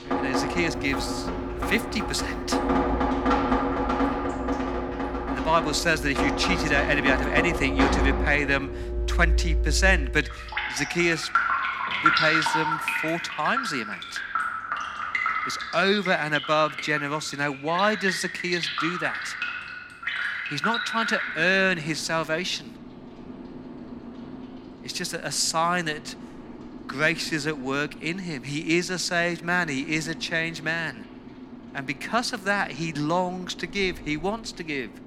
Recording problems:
rain or running water; loud; throughout; 2 dB below the speech

